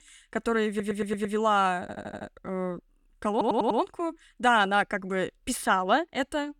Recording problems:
audio stuttering; at 0.5 s, at 2 s and at 3.5 s

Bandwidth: 18.5 kHz